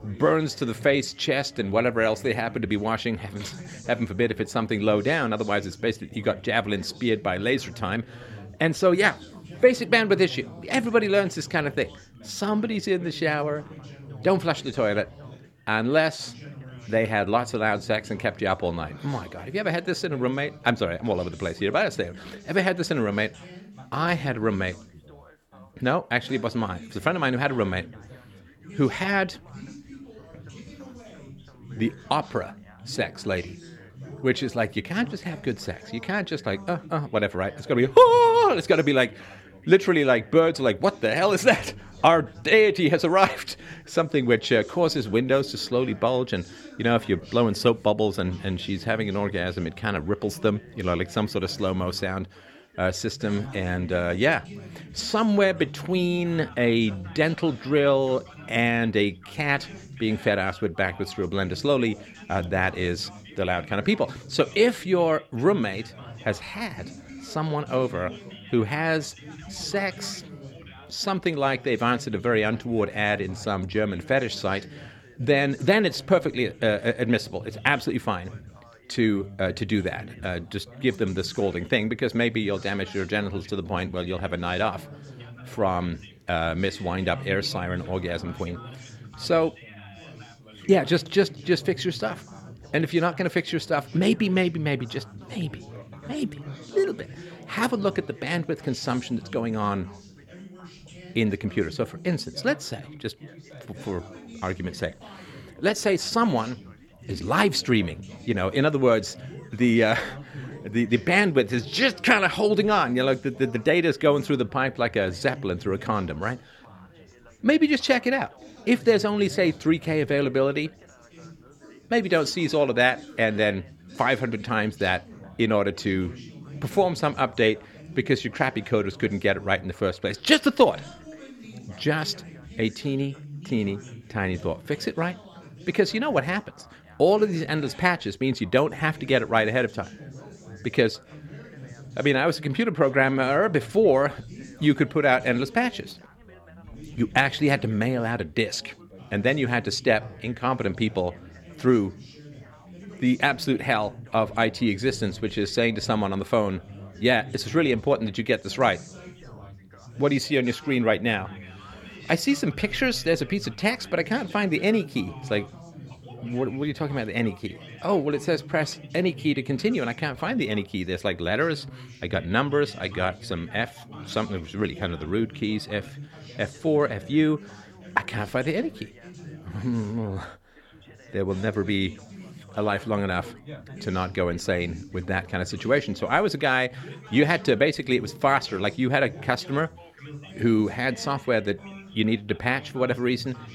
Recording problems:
background chatter; noticeable; throughout; 4 voices, 20 dB below the speech

